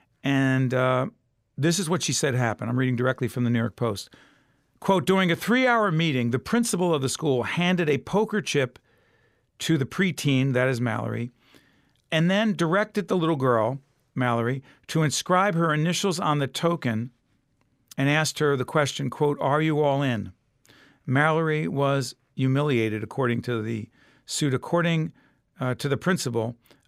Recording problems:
none

